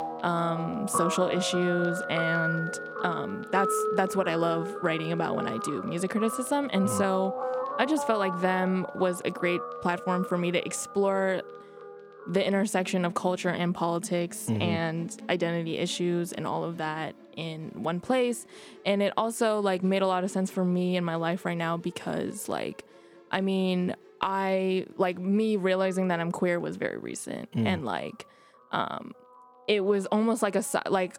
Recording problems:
background music; loud; throughout; 7 dB below the speech

